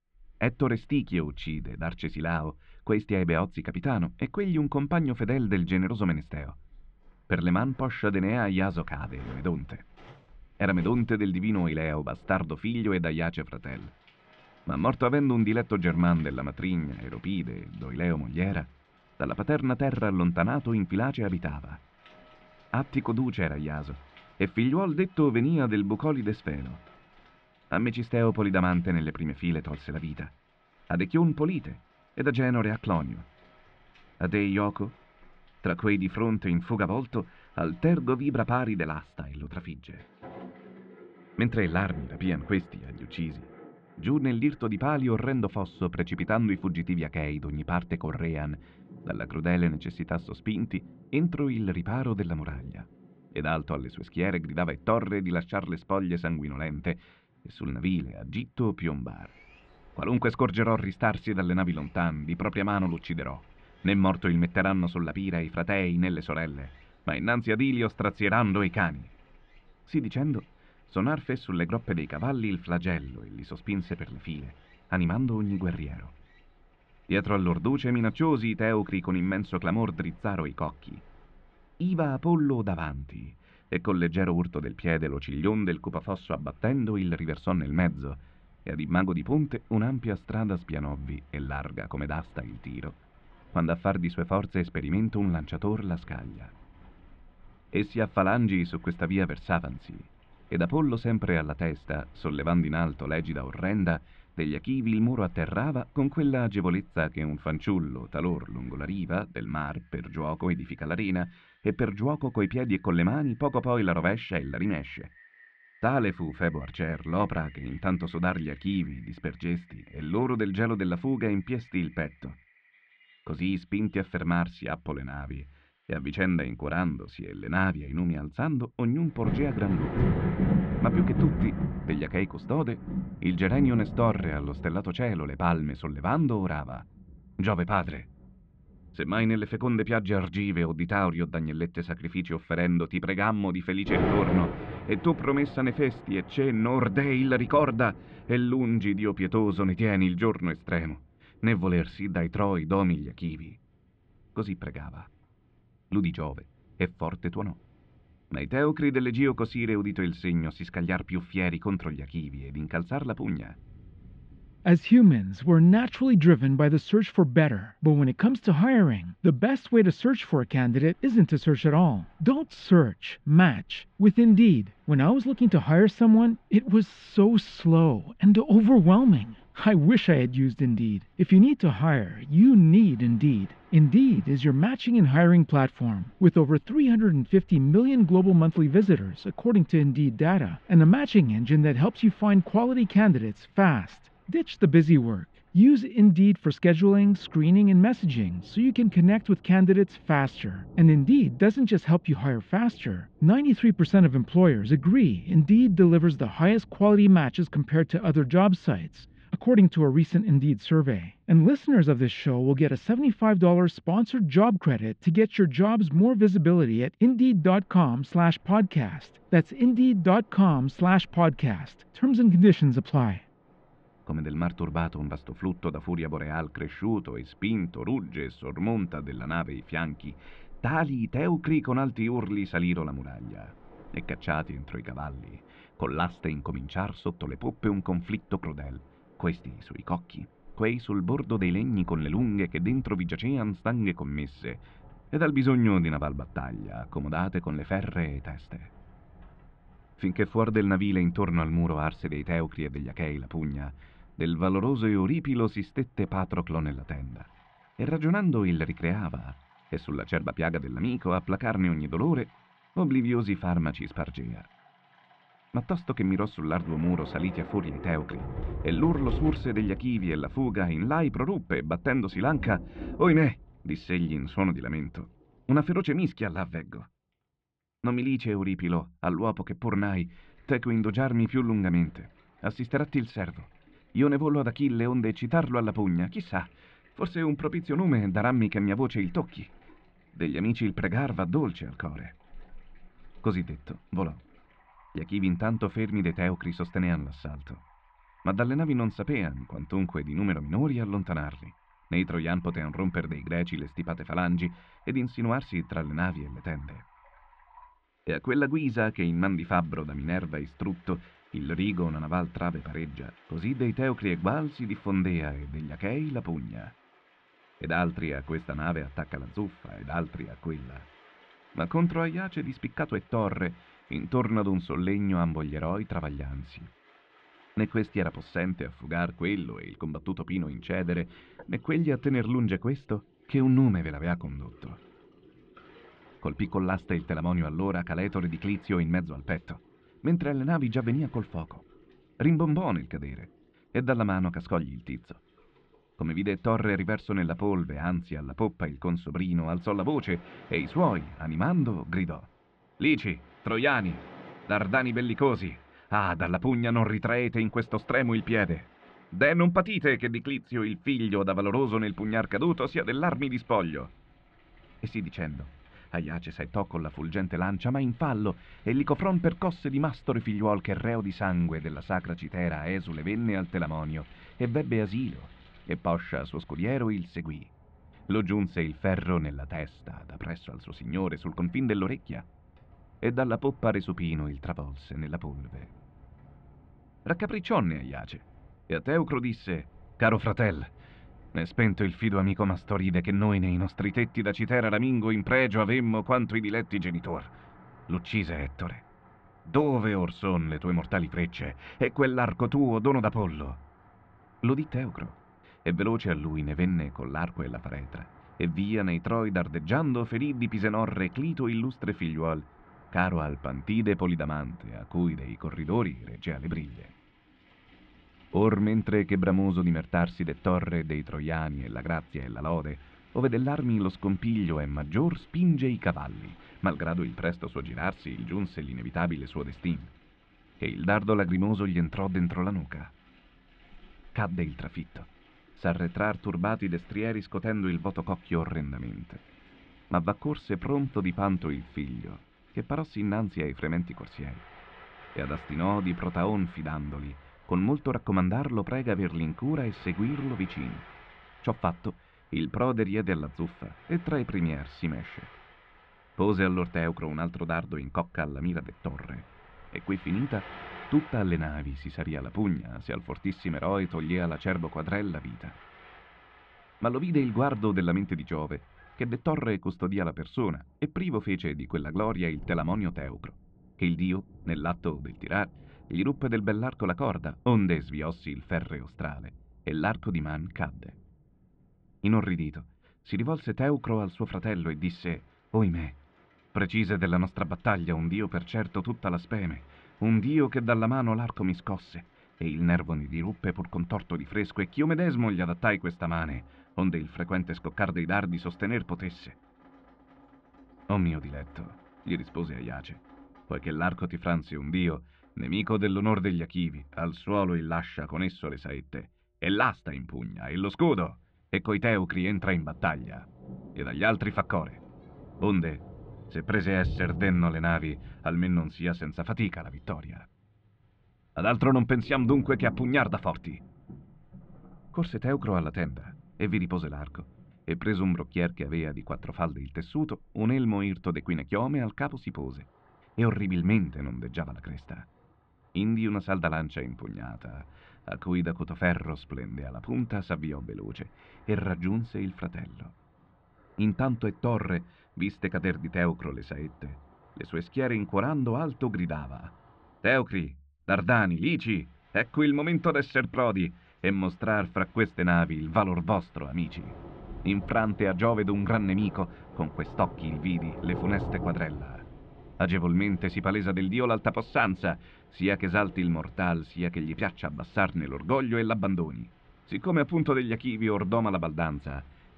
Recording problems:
muffled; very; fading above 3 kHz
rain or running water; noticeable; throughout; 15 dB below the speech

